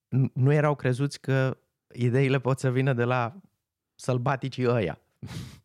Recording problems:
none

